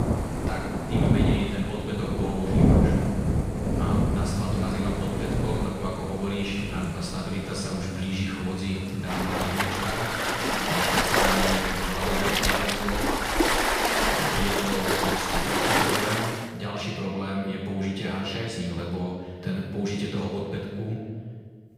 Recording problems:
room echo; strong; dies away in 1.4 s
off-mic speech; far
rain or running water; very loud; until 16 s; 5 dB above the speech

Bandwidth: 15.5 kHz